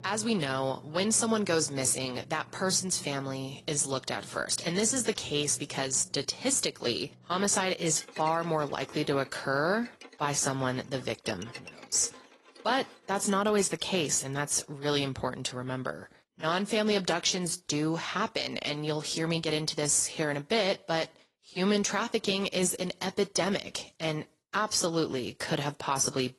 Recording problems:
garbled, watery; slightly; nothing above 11 kHz
background music; faint; until 14 s; 25 dB below the speech

